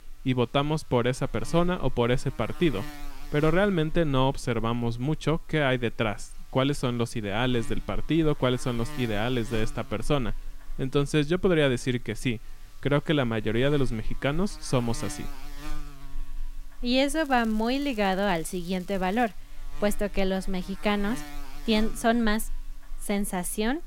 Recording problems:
electrical hum; noticeable; throughout; 50 Hz, 20 dB below the speech
crackling; faint; from 17 to 19 s; 25 dB below the speech

